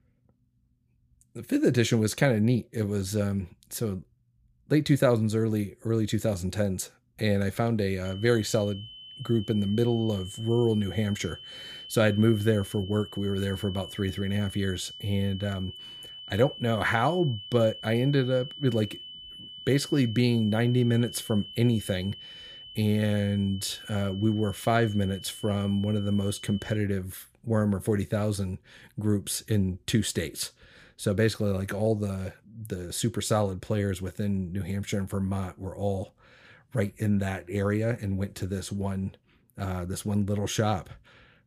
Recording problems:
high-pitched whine; noticeable; from 8 to 27 s; 3 kHz, 15 dB below the speech

